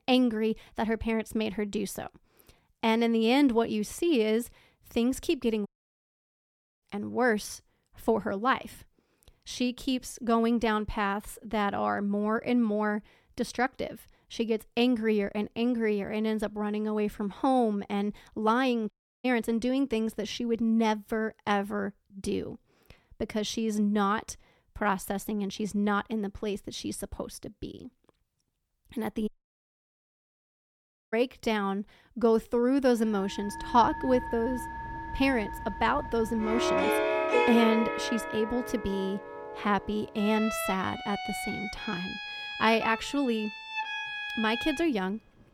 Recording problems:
background music; loud; from 33 s on; 4 dB below the speech
audio cutting out; at 5.5 s for 1 s, at 19 s and at 29 s for 2 s

